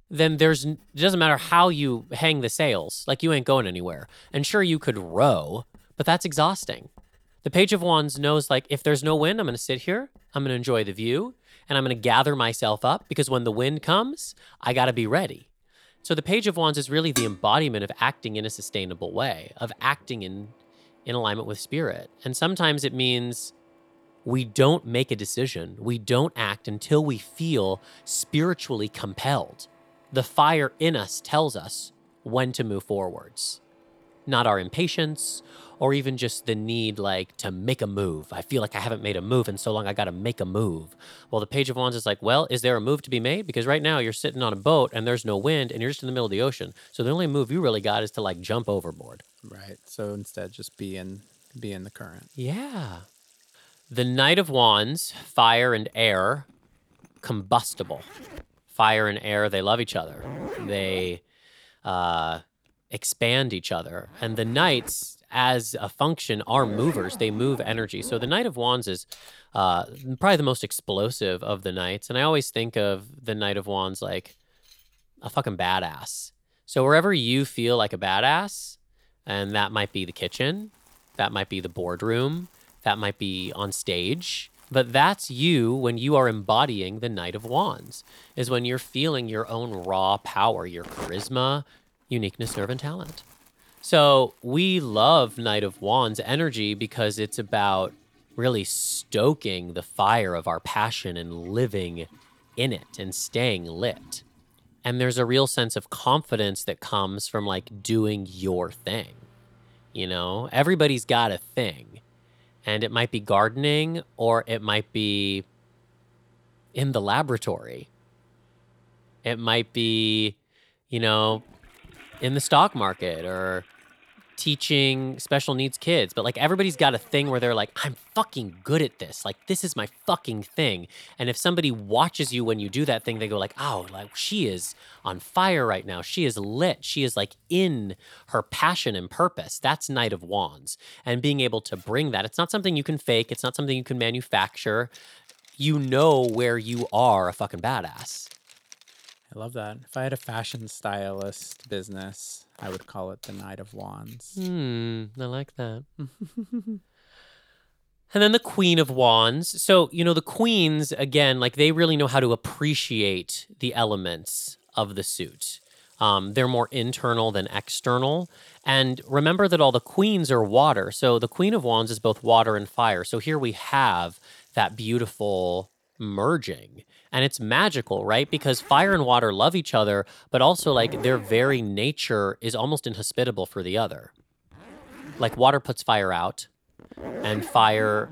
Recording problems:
household noises; faint; throughout; 25 dB below the speech
clattering dishes; noticeable; at 17 s; peak 4 dB below the speech

